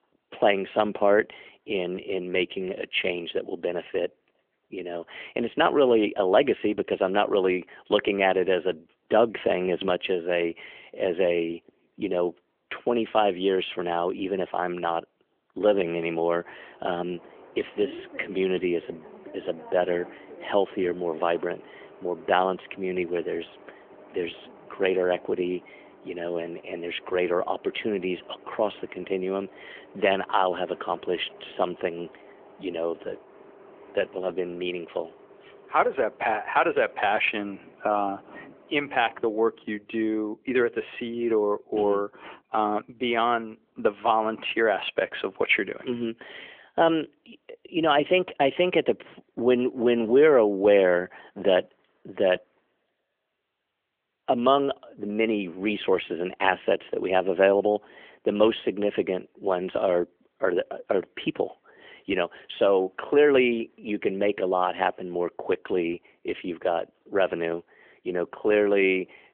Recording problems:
phone-call audio; nothing above 3.5 kHz
traffic noise; faint; throughout; 25 dB below the speech

